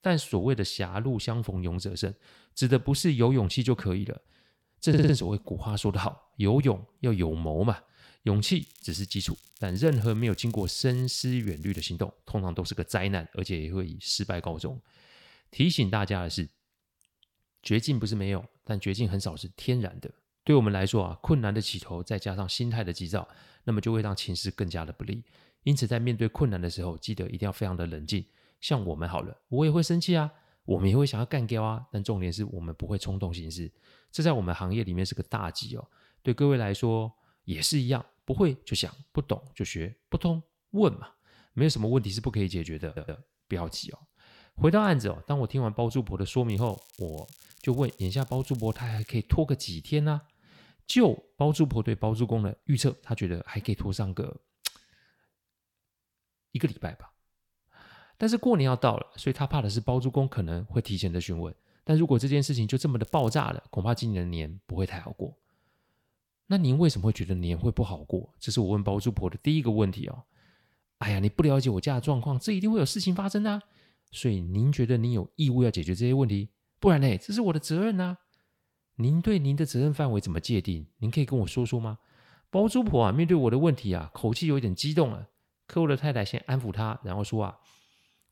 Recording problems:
crackling; faint; from 8.5 to 12 s, from 47 to 49 s and at 1:03; 25 dB below the speech
audio stuttering; at 5 s and at 43 s

